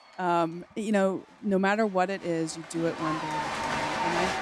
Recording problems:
crowd noise; loud; throughout; 2 dB below the speech

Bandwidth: 14.5 kHz